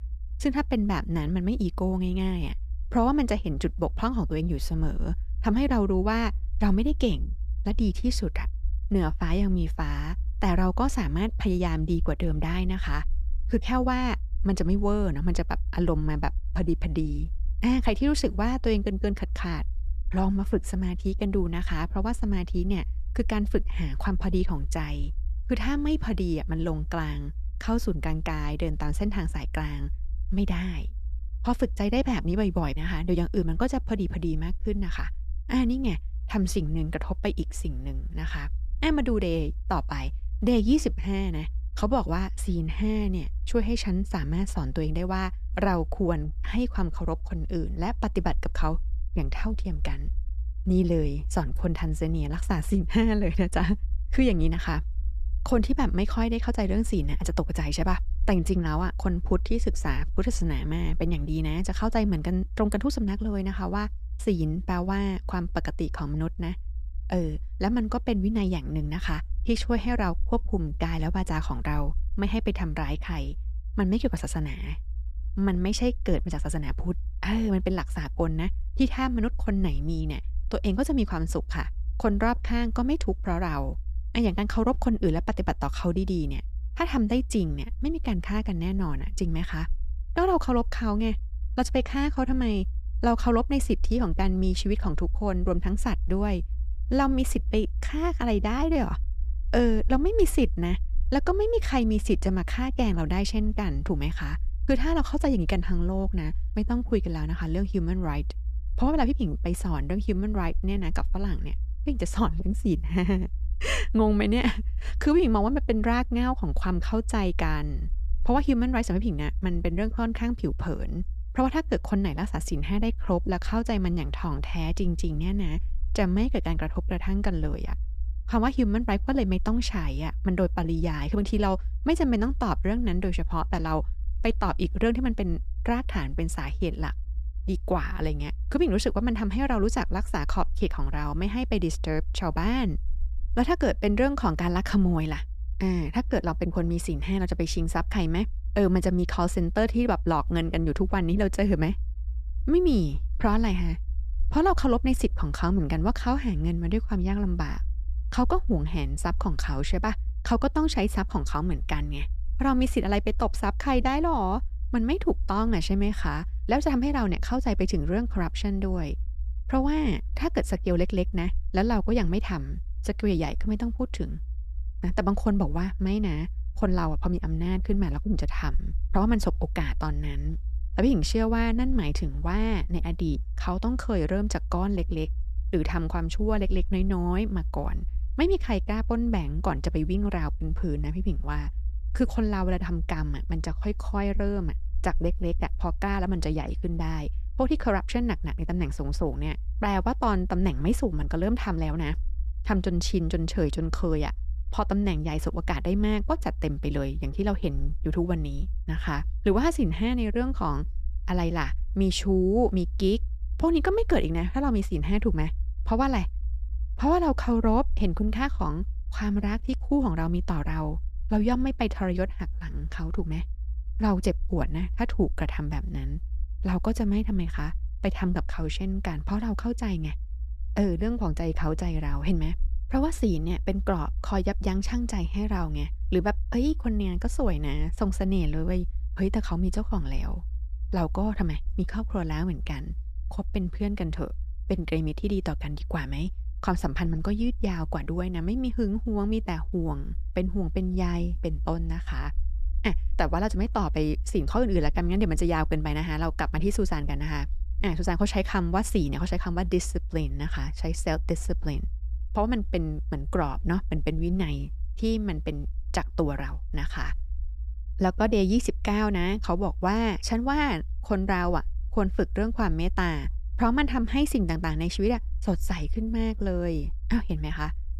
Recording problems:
low rumble; faint; throughout; 25 dB below the speech

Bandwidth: 14.5 kHz